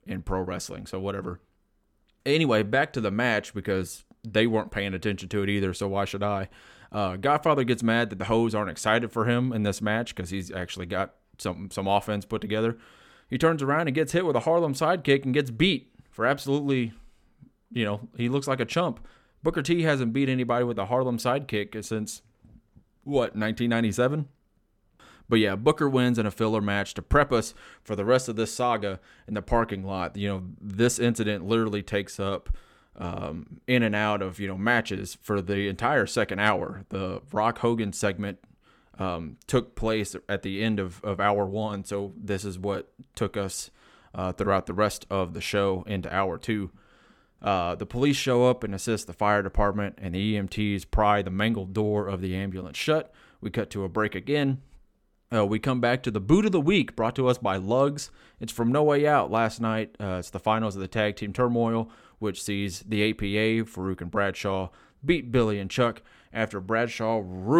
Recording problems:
abrupt cut into speech; at the end

